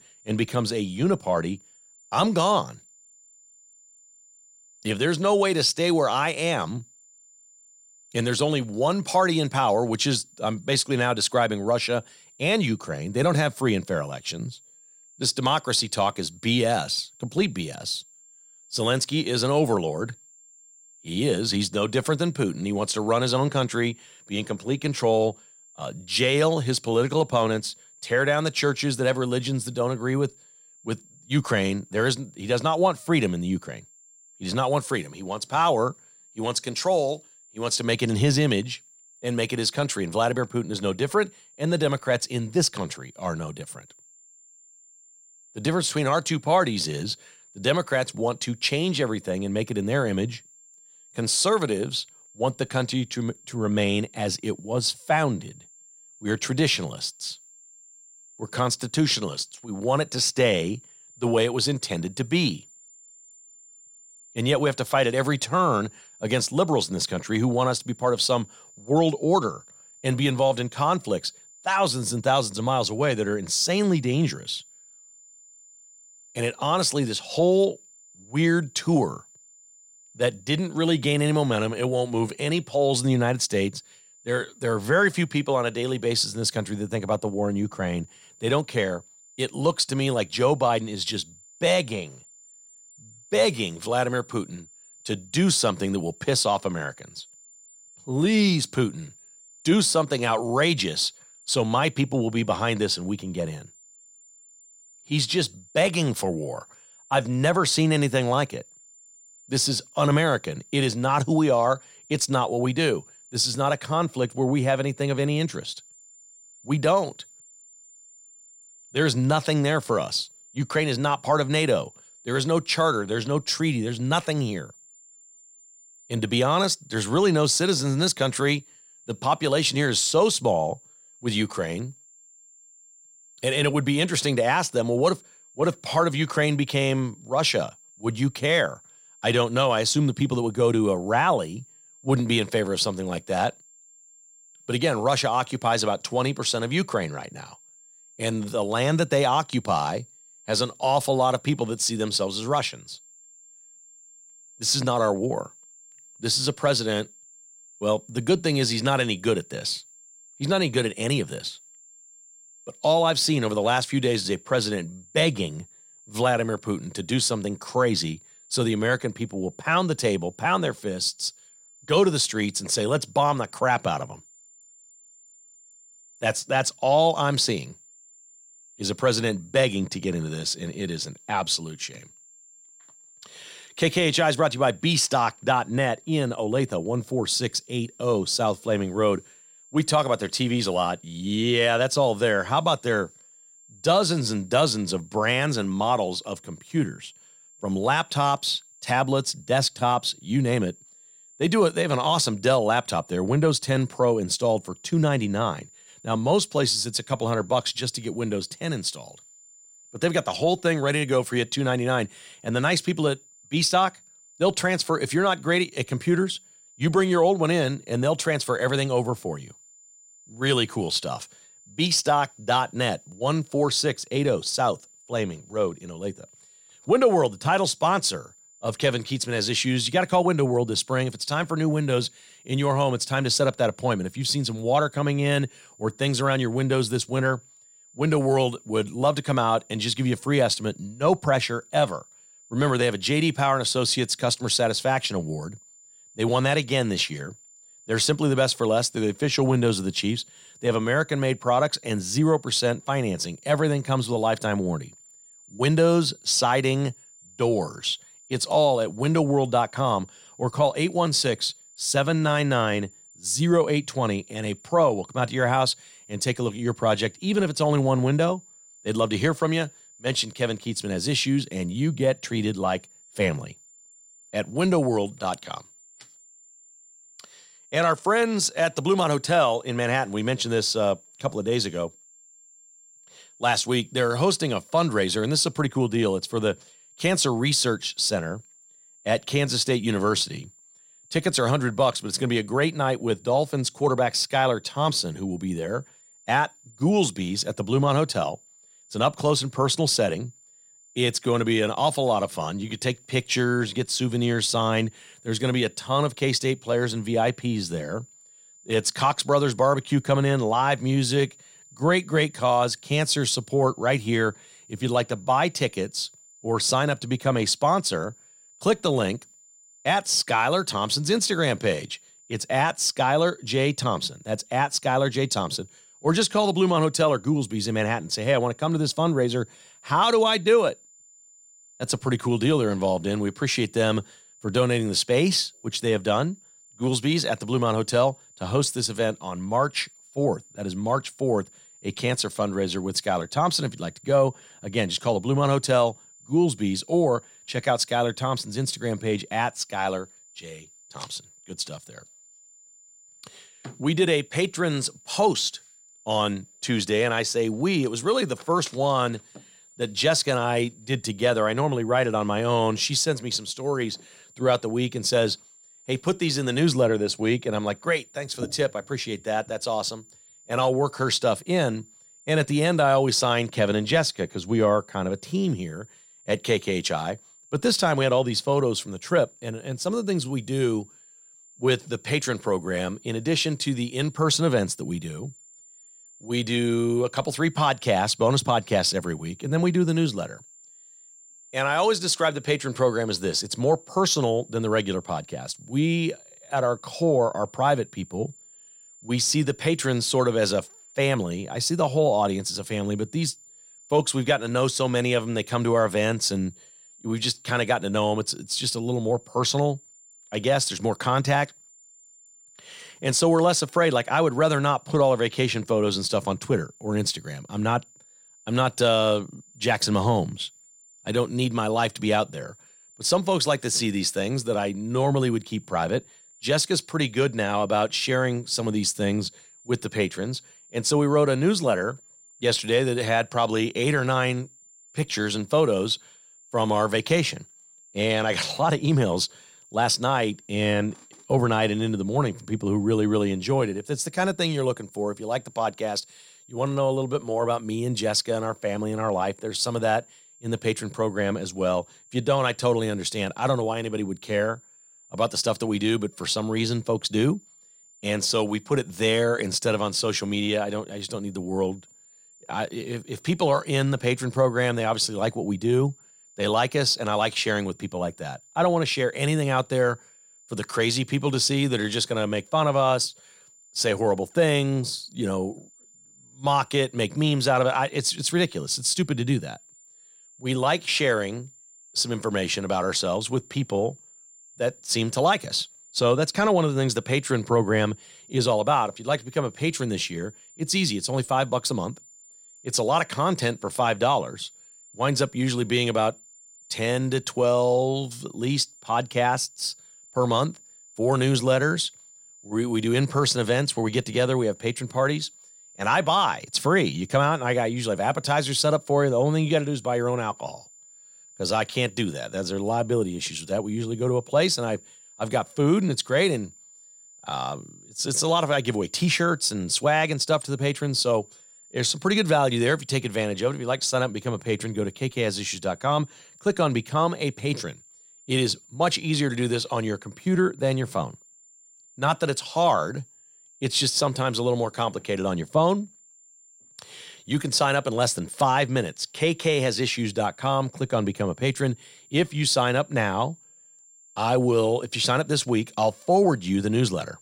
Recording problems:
high-pitched whine; faint; throughout; 7 kHz, 25 dB below the speech

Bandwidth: 16 kHz